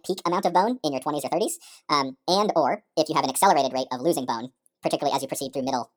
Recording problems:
wrong speed and pitch; too fast and too high; 1.5 times normal speed

